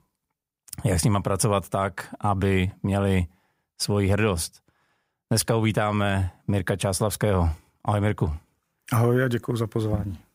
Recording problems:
none

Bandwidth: 15.5 kHz